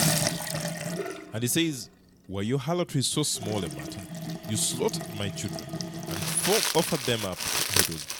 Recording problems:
household noises; loud; throughout; 1 dB below the speech

